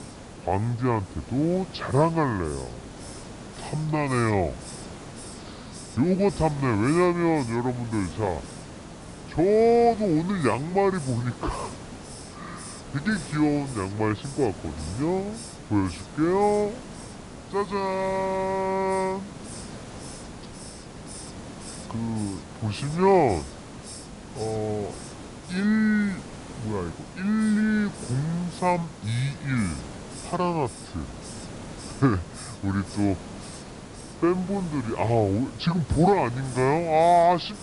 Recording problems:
wrong speed and pitch; too slow and too low; 0.7 times normal speed
high frequencies cut off; noticeable; nothing above 5.5 kHz
hiss; noticeable; throughout; 15 dB below the speech

